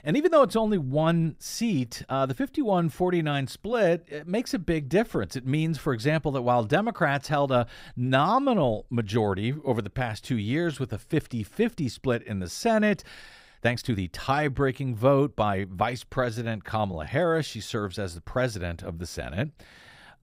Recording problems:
uneven, jittery; strongly; from 1 to 19 s

